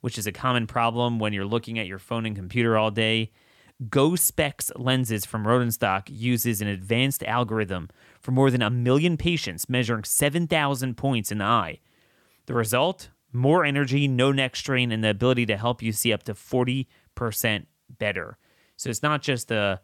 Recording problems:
none

